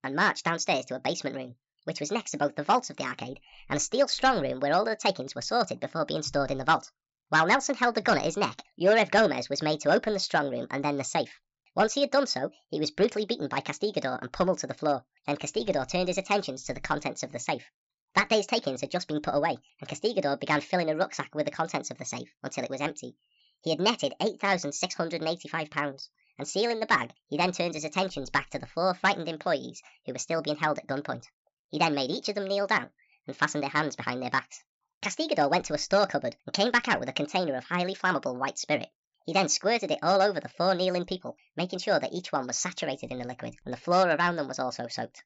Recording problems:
wrong speed and pitch; too fast and too high; 1.5 times normal speed
high frequencies cut off; noticeable; nothing above 8 kHz

